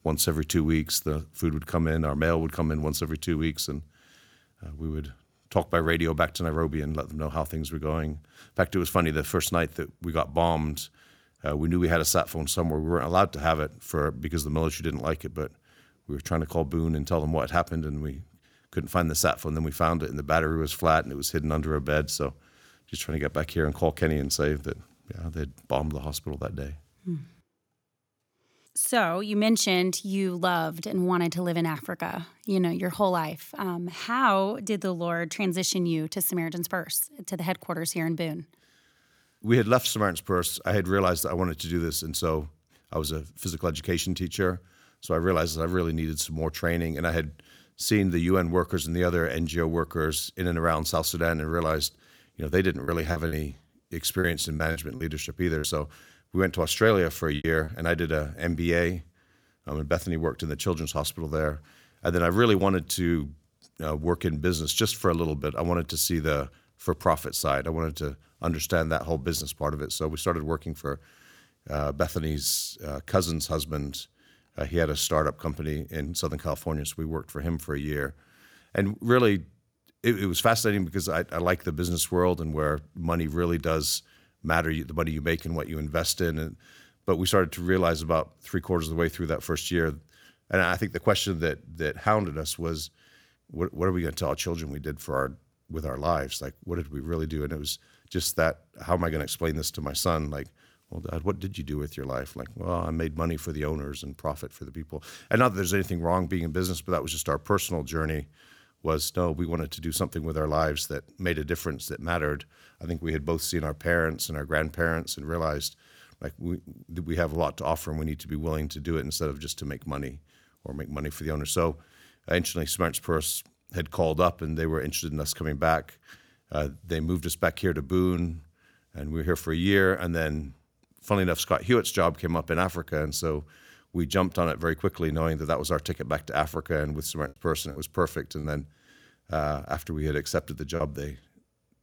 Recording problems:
choppy; very; from 53 to 58 s and from 2:17 to 2:21; 9% of the speech affected

